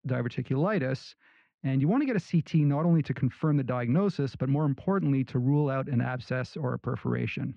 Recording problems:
muffled; very; fading above 2.5 kHz

